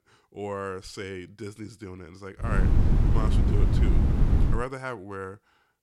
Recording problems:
wind noise on the microphone; heavy; from 2.5 to 4.5 s; as loud as the speech

